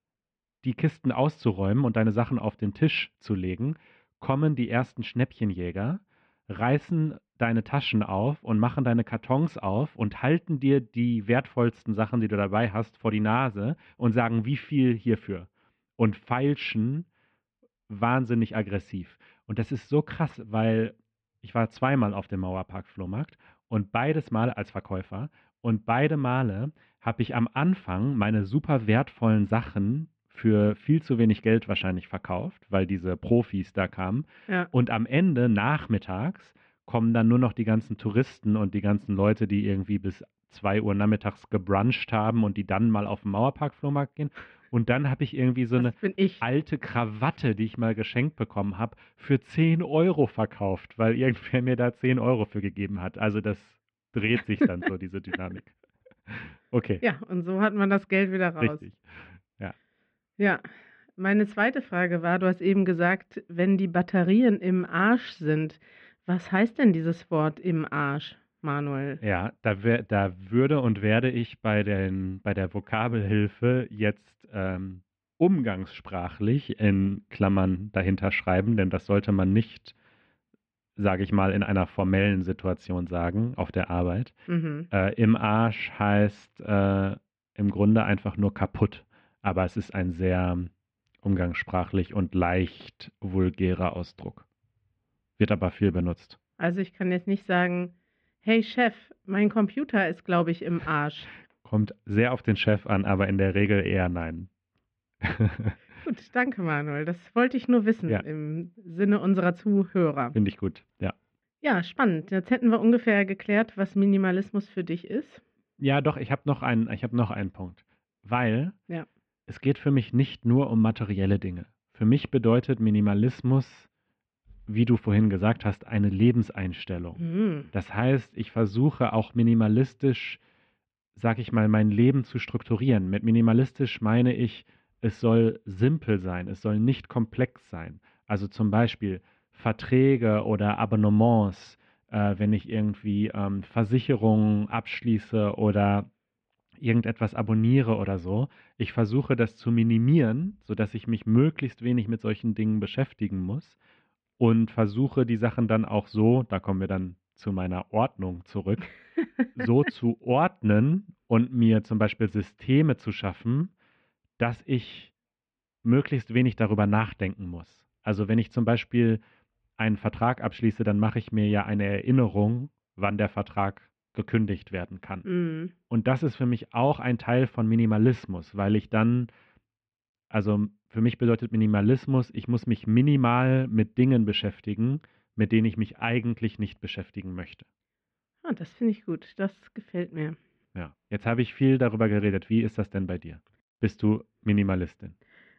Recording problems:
muffled; very; fading above 2.5 kHz

